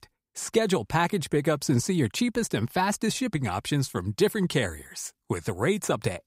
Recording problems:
none

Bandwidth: 15.5 kHz